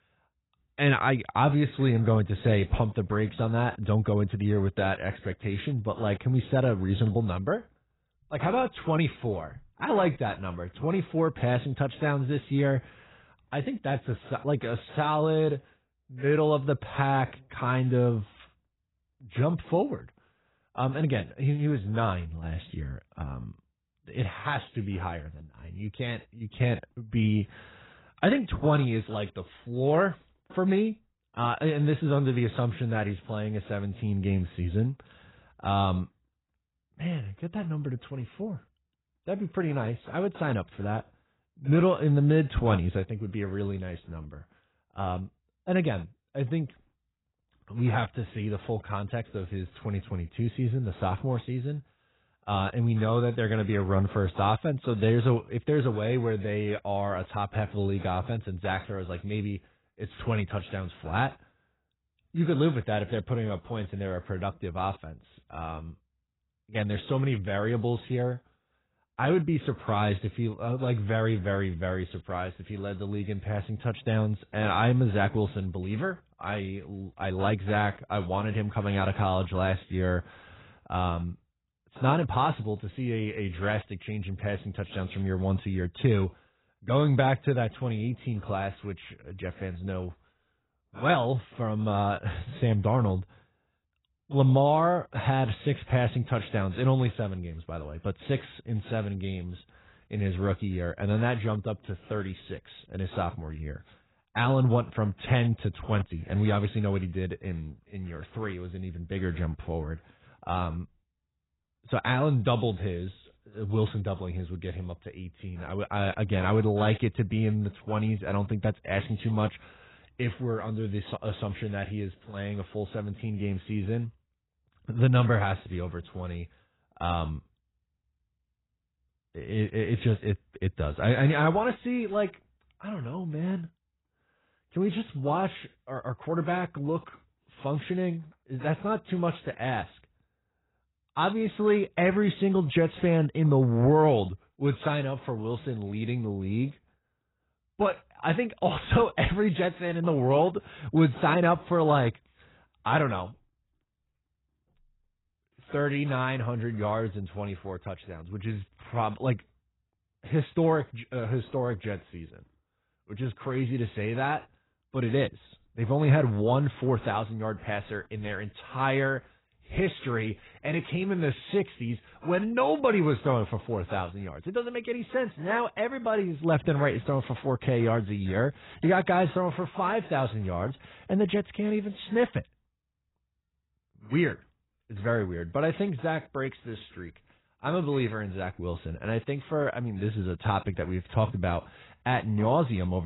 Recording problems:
garbled, watery; badly; nothing above 4 kHz
abrupt cut into speech; at the end

